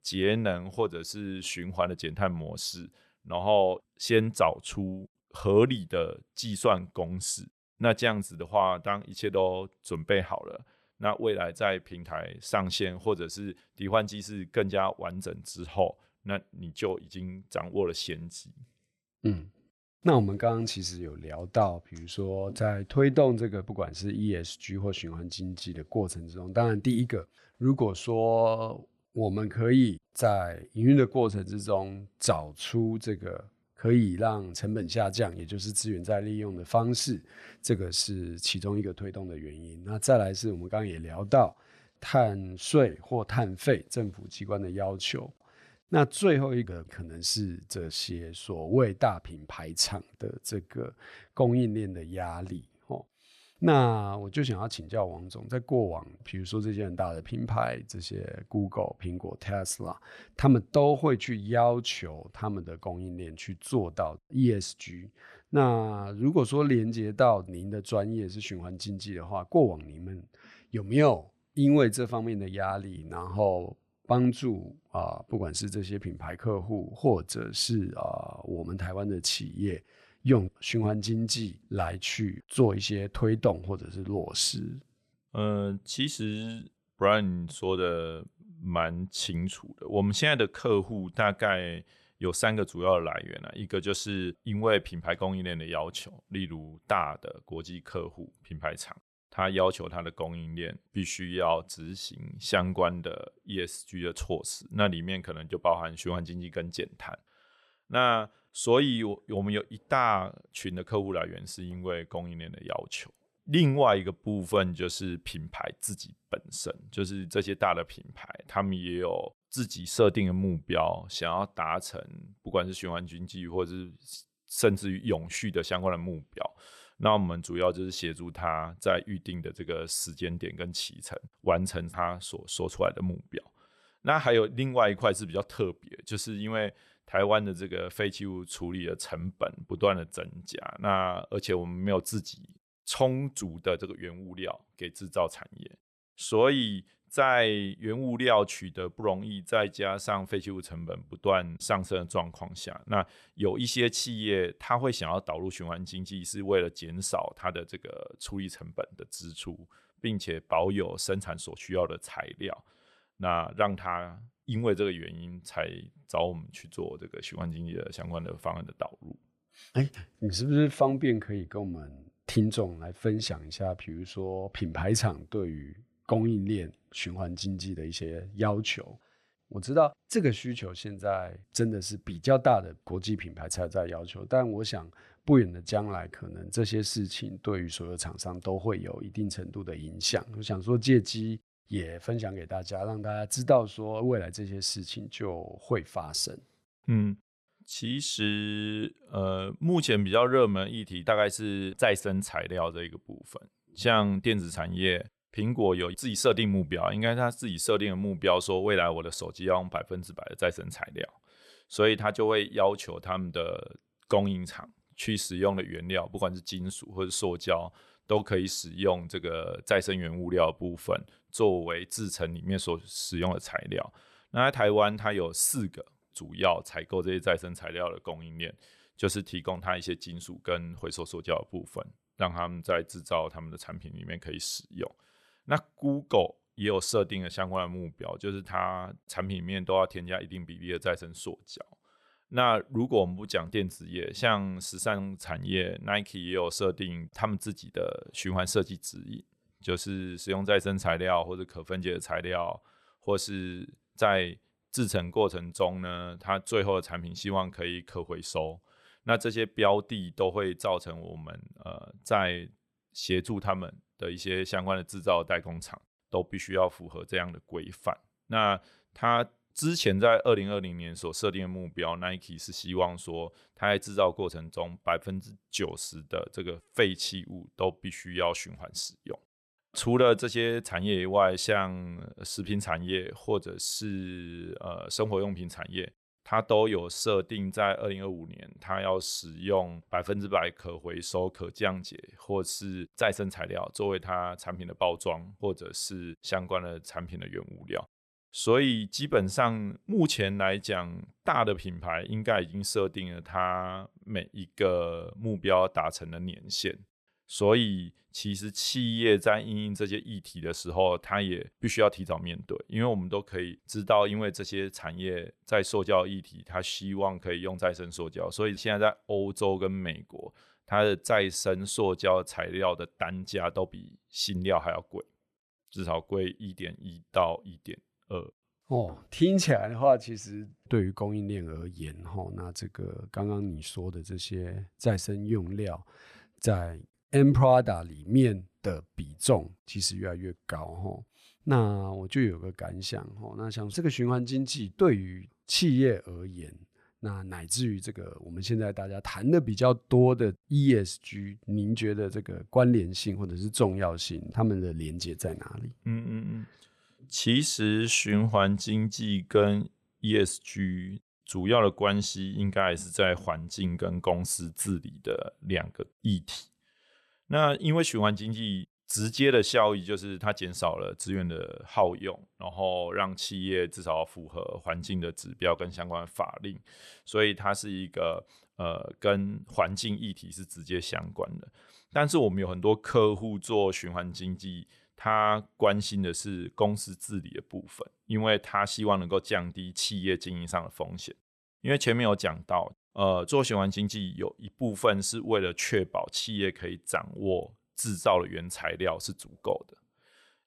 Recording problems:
none

